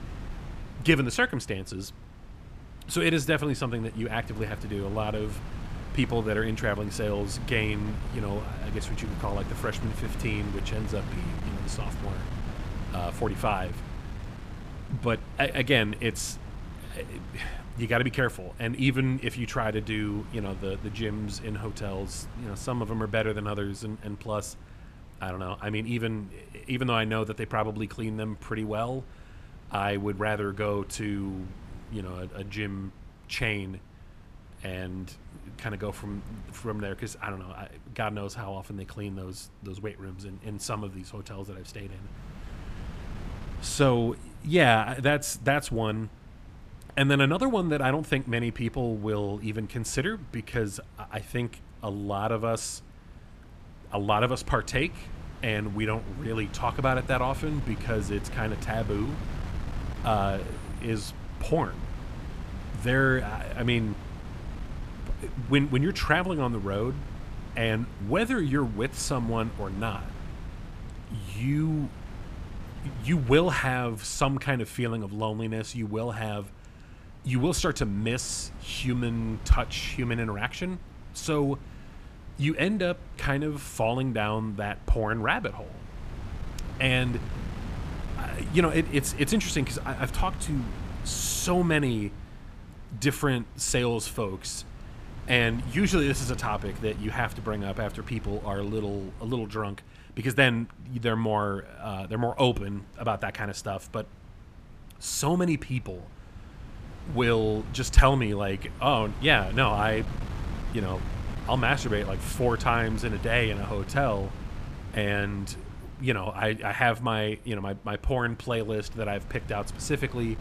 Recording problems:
wind noise on the microphone; occasional gusts; 20 dB below the speech

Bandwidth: 14.5 kHz